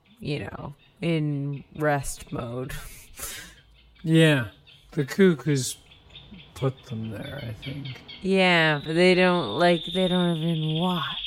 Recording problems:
wrong speed, natural pitch; too slow; 0.5 times normal speed
animal sounds; noticeable; throughout; 10 dB below the speech

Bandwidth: 16 kHz